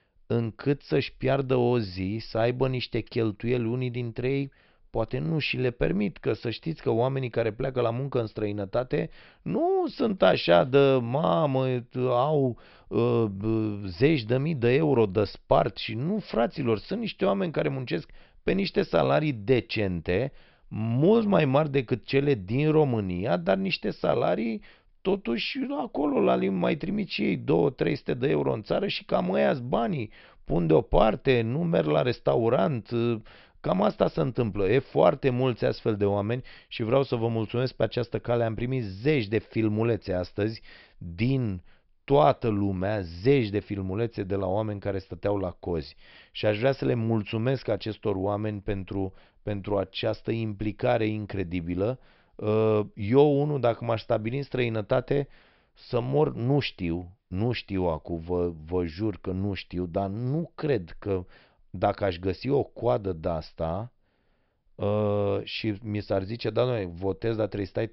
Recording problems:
high frequencies cut off; noticeable; nothing above 5.5 kHz

